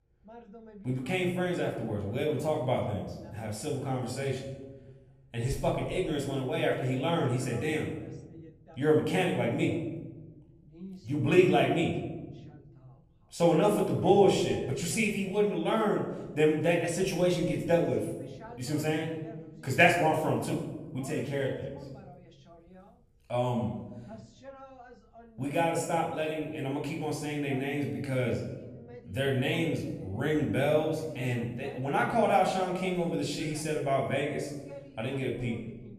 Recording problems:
room echo; noticeable; dies away in 1 s
off-mic speech; somewhat distant
voice in the background; faint; throughout; 20 dB below the speech

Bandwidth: 14.5 kHz